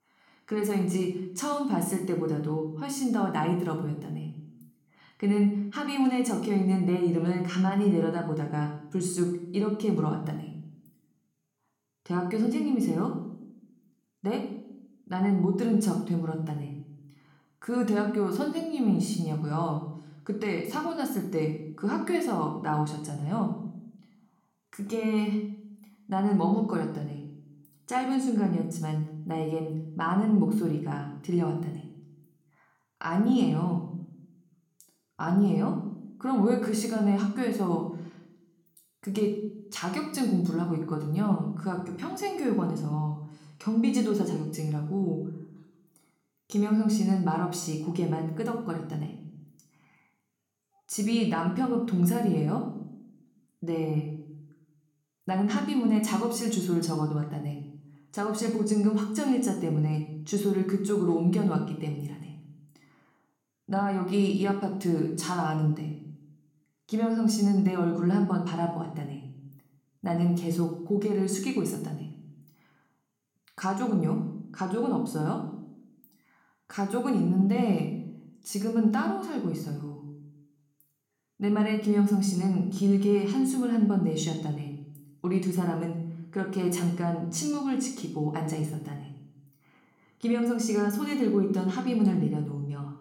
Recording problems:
room echo; slight; dies away in 0.6 s
off-mic speech; somewhat distant

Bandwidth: 17.5 kHz